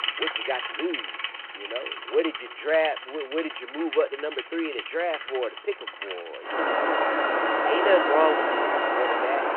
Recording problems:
phone-call audio
traffic noise; very loud; throughout; 1 dB above the speech

